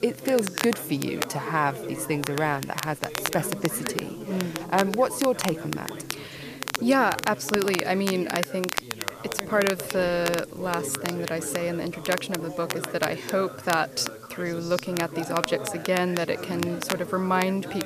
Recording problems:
crackle, like an old record; loud; 7 dB below the speech
background chatter; noticeable; throughout; 4 voices, 10 dB below the speech
hiss; faint; throughout; 25 dB below the speech

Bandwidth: 14.5 kHz